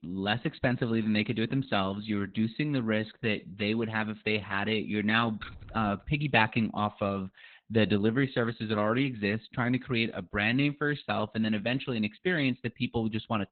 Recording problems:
garbled, watery; badly; nothing above 4 kHz
jangling keys; faint; at 5.5 s; peak 15 dB below the speech

